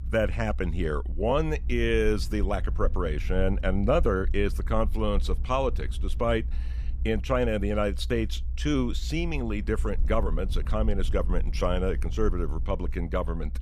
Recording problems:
low rumble; faint; throughout; 20 dB below the speech

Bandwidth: 14.5 kHz